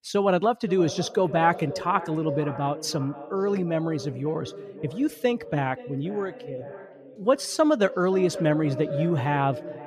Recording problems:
echo of what is said; noticeable; throughout; 520 ms later, 10 dB below the speech

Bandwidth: 14.5 kHz